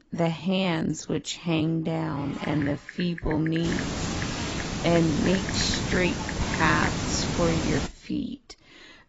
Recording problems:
garbled, watery; badly; nothing above 7.5 kHz
wrong speed, natural pitch; too slow; 0.6 times normal speed
hiss; loud; from 3.5 to 8 s; 3 dB below the speech
keyboard typing; noticeable; from 2 to 7 s; peak 8 dB below the speech

